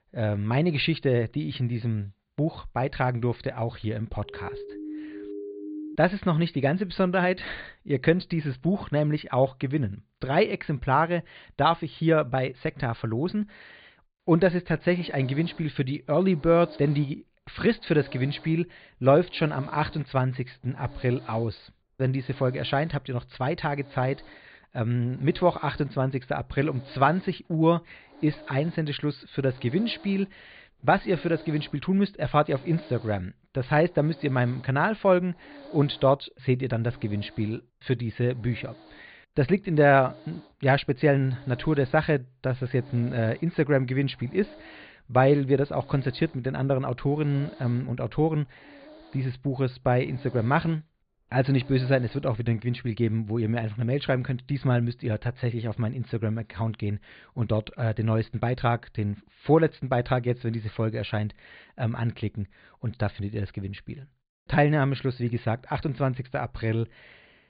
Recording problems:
high frequencies cut off; severe; nothing above 4.5 kHz
hiss; faint; from 14 to 52 s; 25 dB below the speech
siren; faint; from 4 to 6 s; peak 10 dB below the speech

